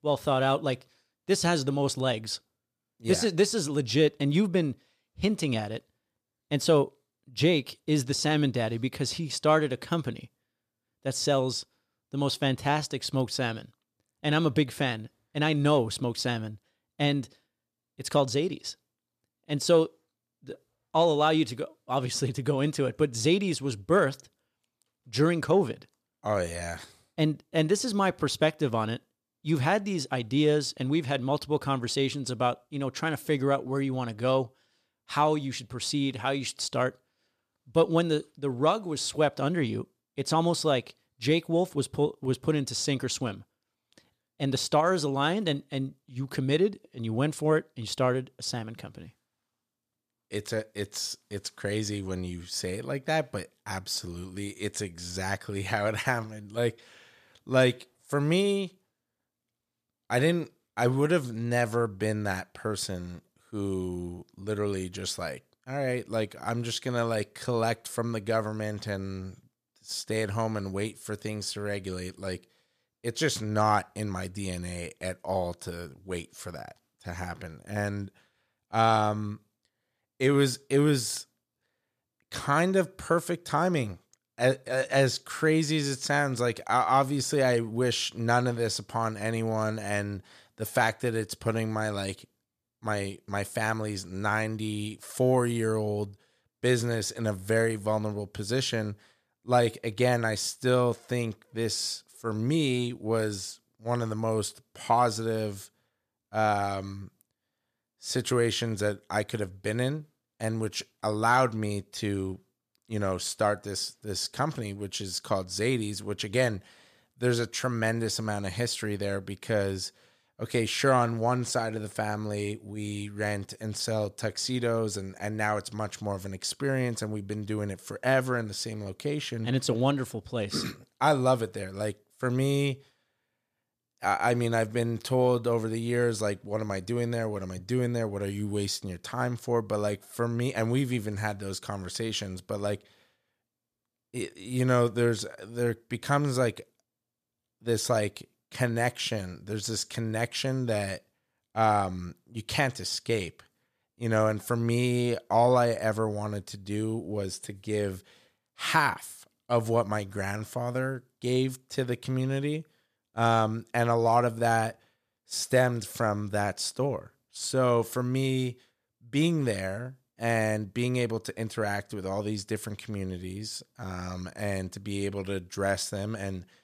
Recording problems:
none

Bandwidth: 14.5 kHz